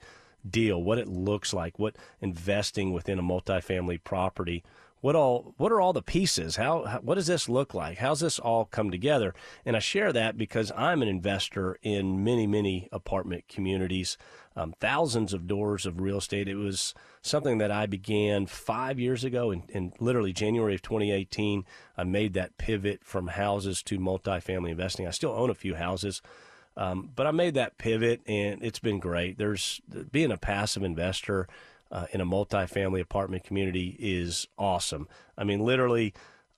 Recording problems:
none

